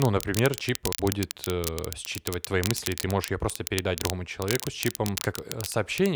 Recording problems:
crackle, like an old record; loud; 5 dB below the speech
abrupt cut into speech; at the start and the end
uneven, jittery; strongly; from 0.5 to 5.5 s

